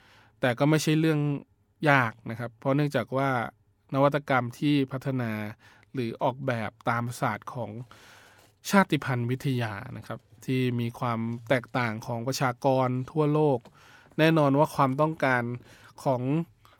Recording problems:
none

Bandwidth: 17.5 kHz